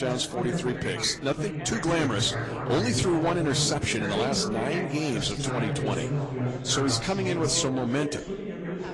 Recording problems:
distortion; slight; 6% of the sound clipped
garbled, watery; slightly
background chatter; loud; throughout; 4 voices, 5 dB below the speech
abrupt cut into speech; at the start

